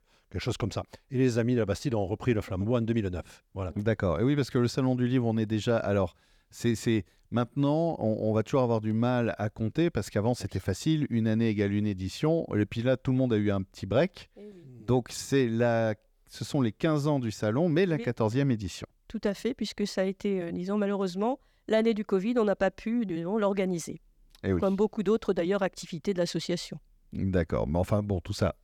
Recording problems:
none

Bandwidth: 19 kHz